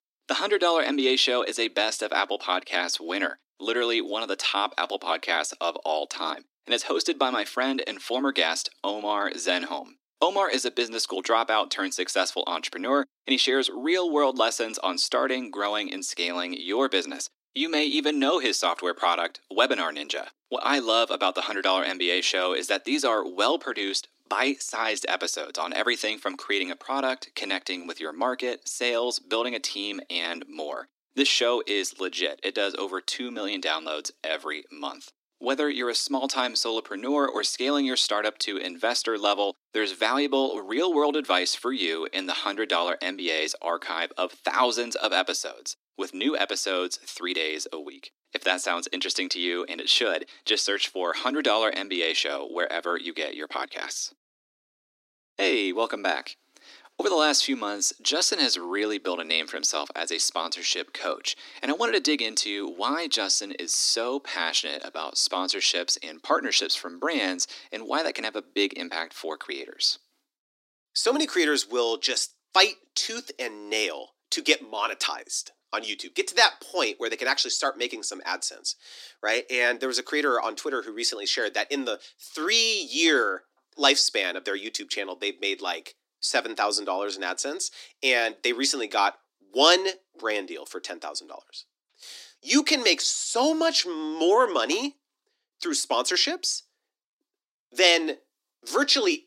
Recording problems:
thin; somewhat; fading below 250 Hz

